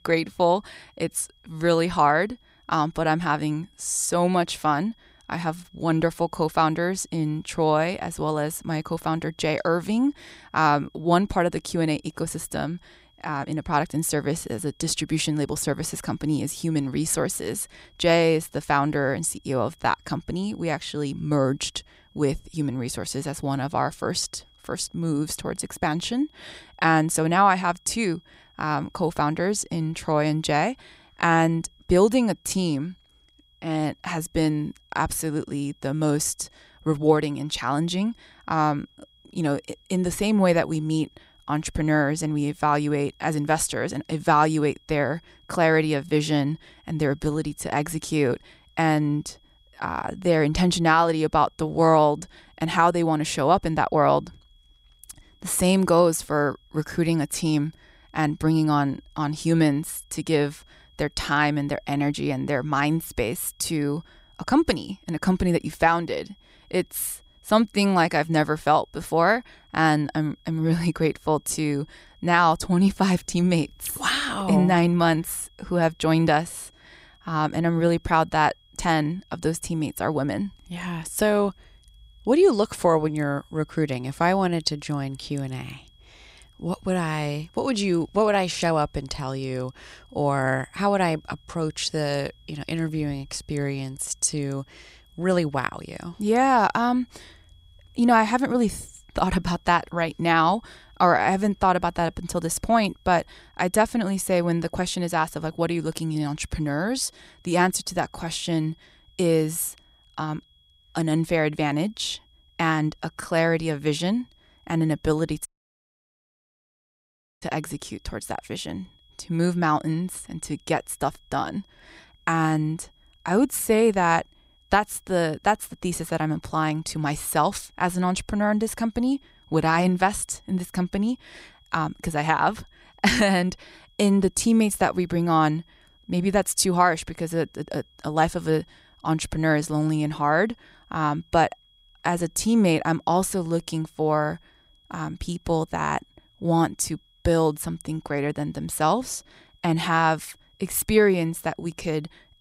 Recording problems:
high-pitched whine; faint; throughout; 3.5 kHz, 35 dB below the speech
audio cutting out; at 1:55 for 2 s

